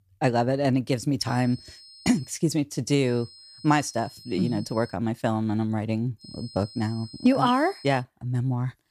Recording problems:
high-pitched whine; noticeable; from 1.5 to 2.5 s, from 3 to 5 s and from 6 to 8 s; 5 kHz, 20 dB below the speech

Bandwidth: 15 kHz